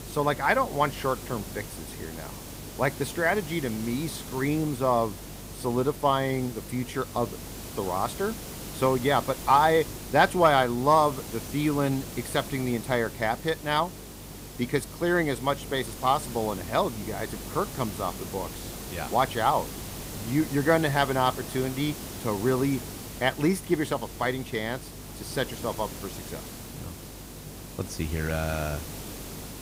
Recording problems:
hiss; noticeable; throughout; 10 dB below the speech
electrical hum; faint; throughout; 50 Hz, 30 dB below the speech

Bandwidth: 15.5 kHz